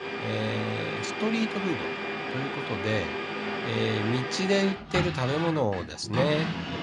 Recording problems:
household noises; loud; throughout; 2 dB below the speech

